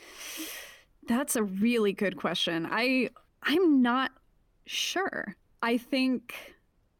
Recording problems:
none

